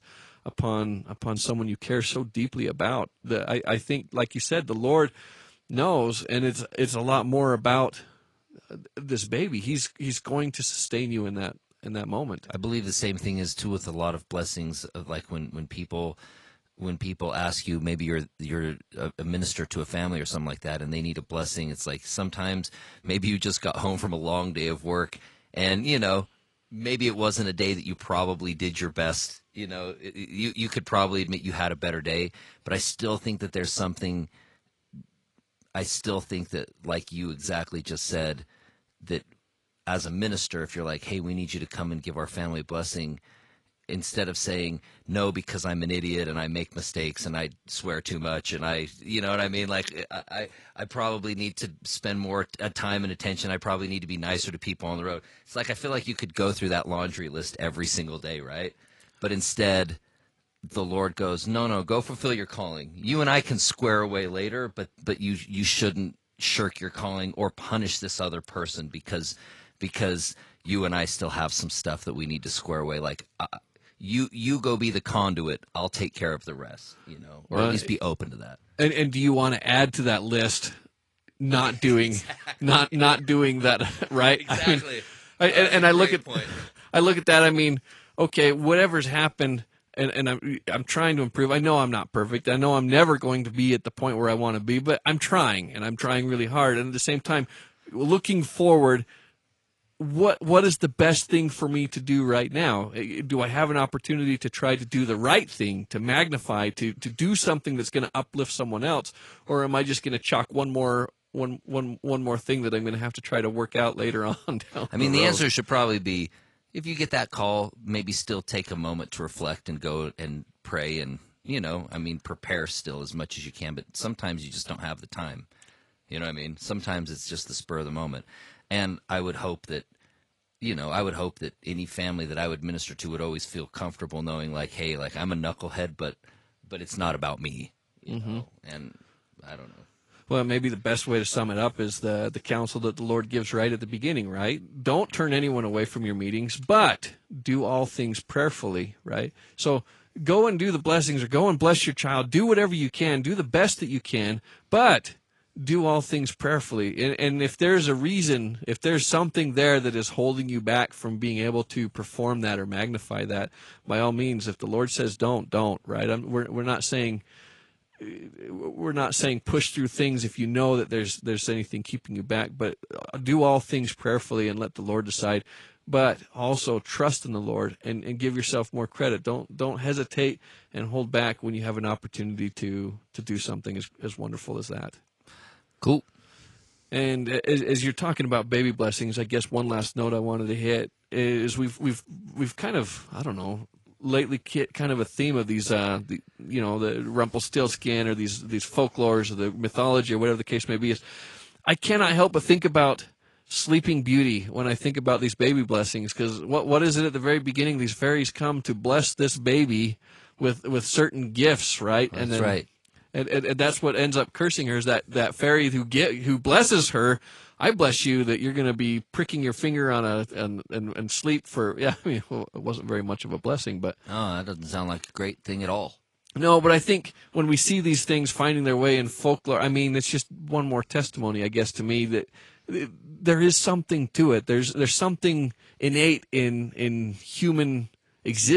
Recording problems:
garbled, watery; slightly; nothing above 10.5 kHz
abrupt cut into speech; at the end

